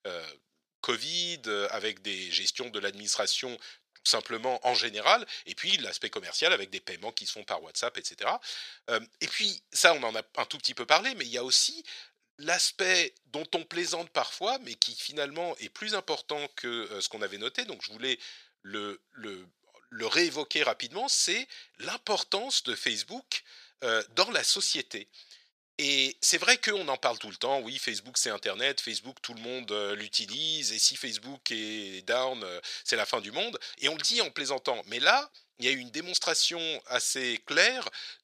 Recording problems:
thin; very; fading below 750 Hz

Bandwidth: 14.5 kHz